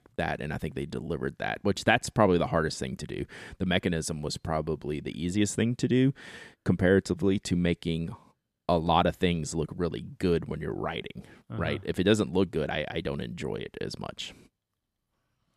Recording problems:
none

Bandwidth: 14.5 kHz